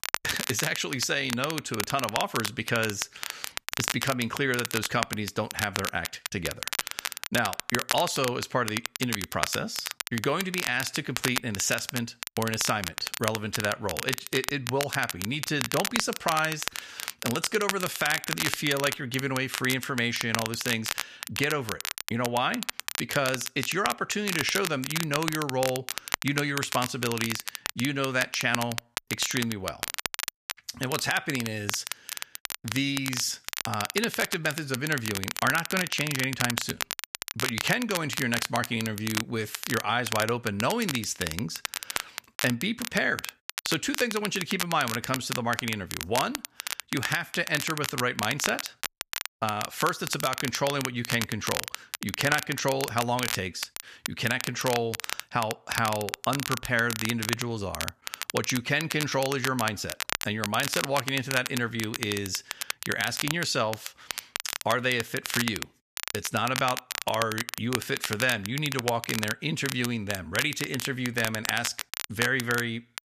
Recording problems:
crackle, like an old record; loud; 4 dB below the speech

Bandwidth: 14.5 kHz